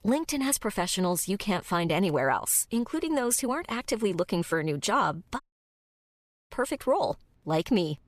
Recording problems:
audio cutting out; at 5.5 s for 1 s

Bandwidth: 14.5 kHz